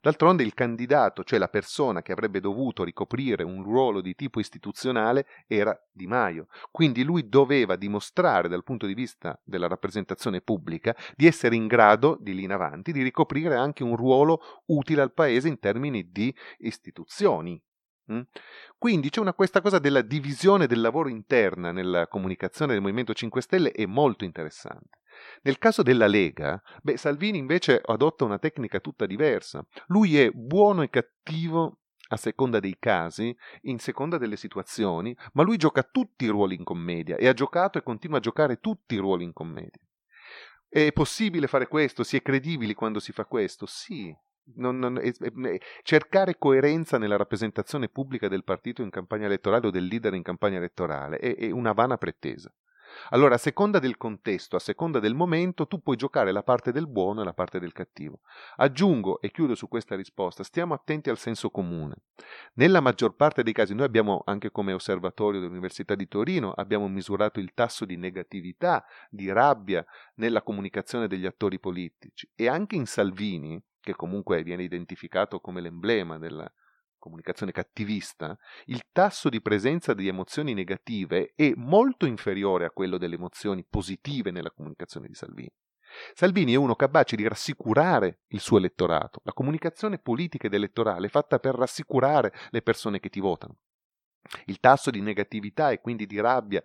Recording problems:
none

